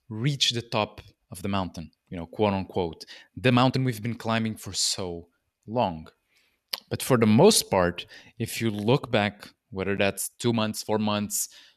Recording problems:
uneven, jittery; strongly; from 1.5 to 11 s

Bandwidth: 14 kHz